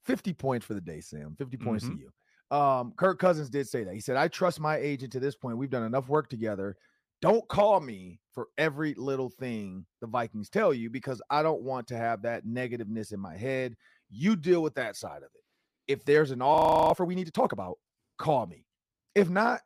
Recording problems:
audio freezing; at 17 s

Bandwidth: 15 kHz